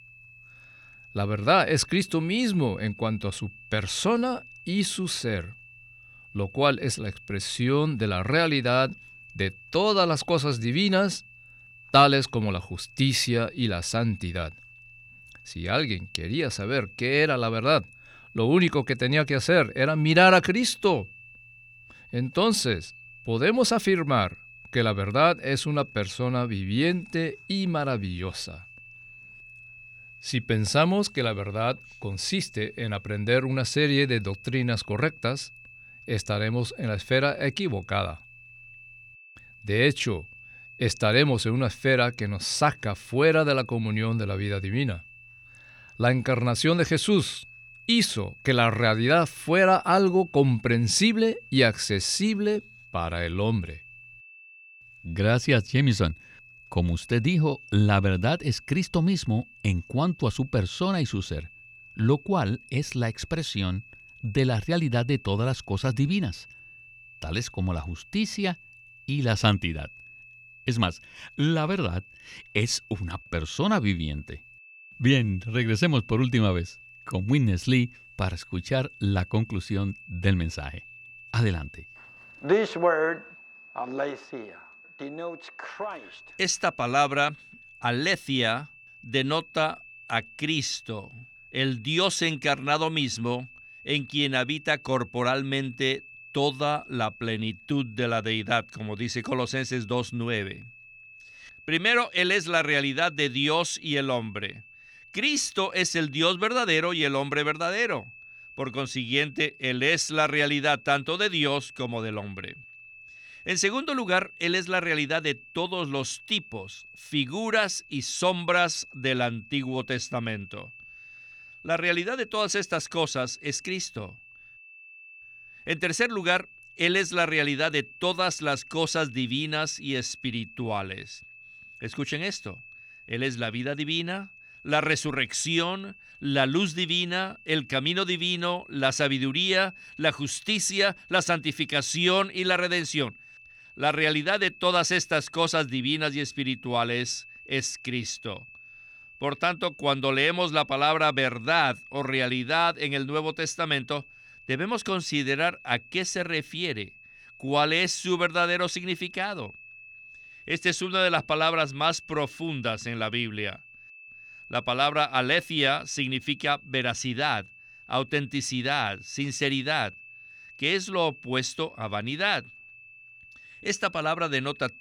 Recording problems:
high-pitched whine; faint; throughout; 2.5 kHz, 20 dB below the speech

